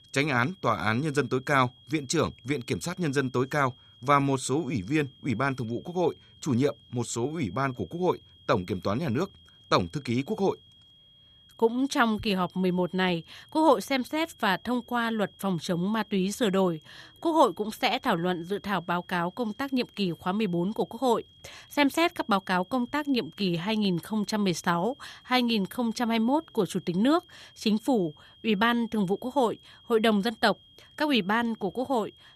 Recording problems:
high-pitched whine; faint; throughout; 3.5 kHz, 25 dB below the speech

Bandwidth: 14.5 kHz